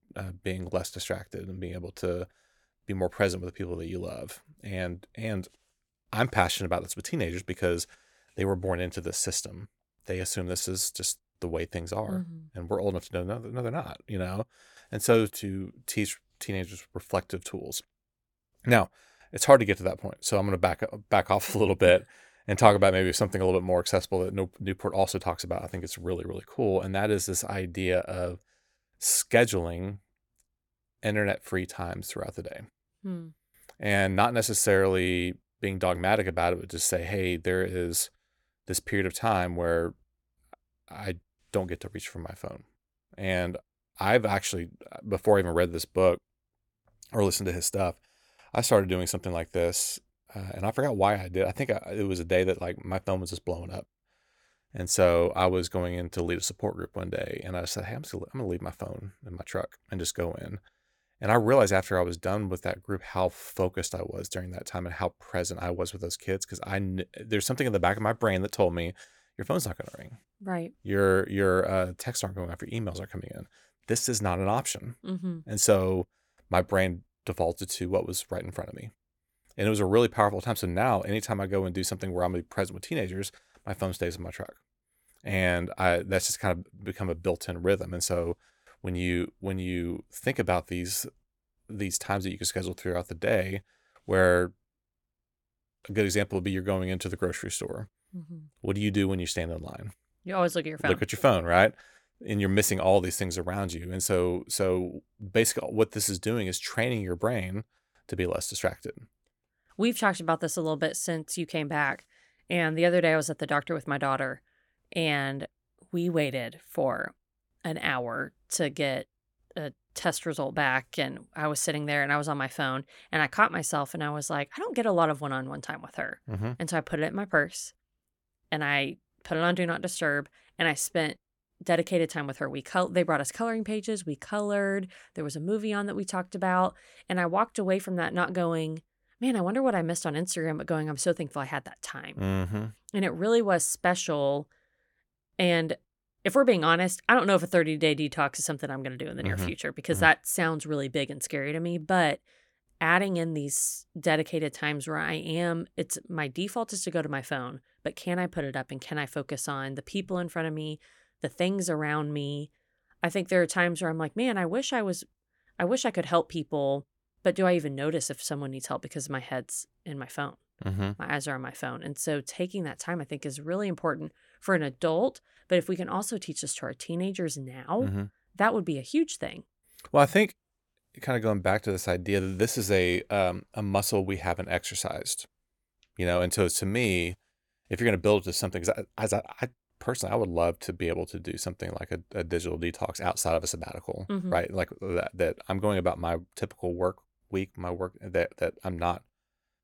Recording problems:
none

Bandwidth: 18 kHz